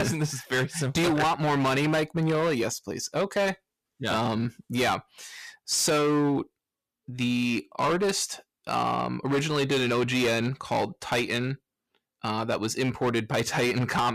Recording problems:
distortion; heavy; 13% of the sound clipped
abrupt cut into speech; at the start and the end

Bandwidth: 14.5 kHz